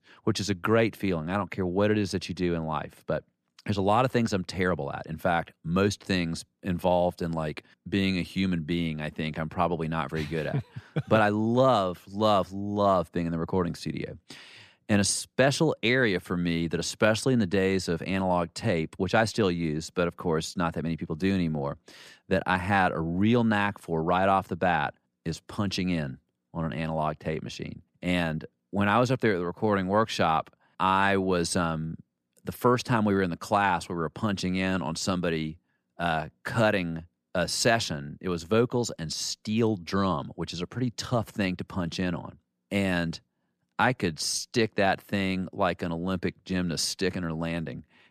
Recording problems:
none

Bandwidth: 14.5 kHz